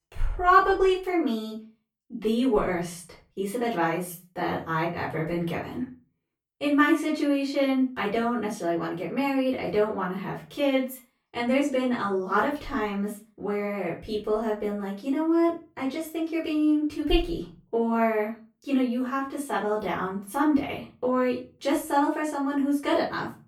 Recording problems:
off-mic speech; far
room echo; slight; dies away in 0.3 s

